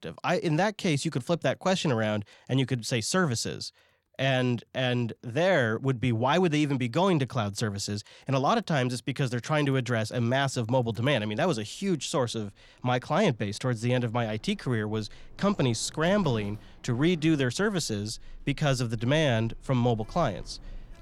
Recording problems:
household noises; faint; throughout; 25 dB below the speech

